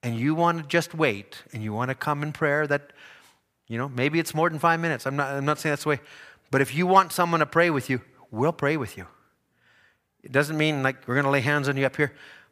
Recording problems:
none

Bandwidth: 15 kHz